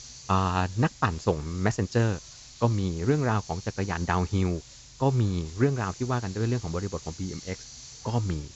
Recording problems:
high frequencies cut off; noticeable; nothing above 7.5 kHz
hiss; noticeable; throughout; 15 dB below the speech

